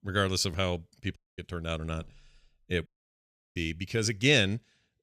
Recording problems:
audio cutting out; at 1 s and at 3 s for 0.5 s

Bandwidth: 14 kHz